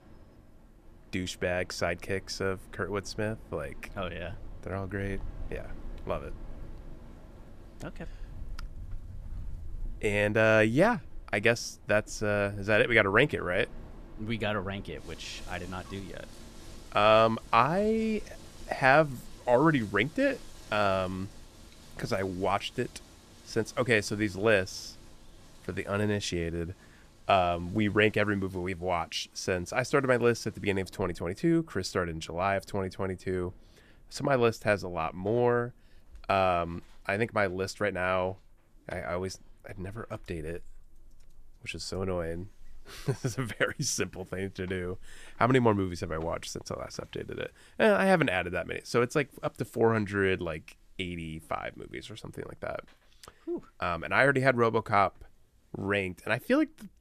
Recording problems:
wind in the background; faint; throughout; 20 dB below the speech

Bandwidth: 14.5 kHz